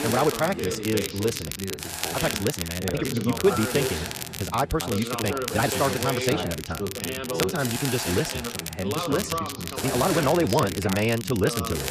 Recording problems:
wrong speed, natural pitch; too fast; 1.6 times normal speed
background chatter; loud; throughout; 2 voices, 6 dB below the speech
hiss; loud; throughout; 7 dB below the speech
crackle, like an old record; loud; 7 dB below the speech
uneven, jittery; strongly; from 2 to 10 s

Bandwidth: 14.5 kHz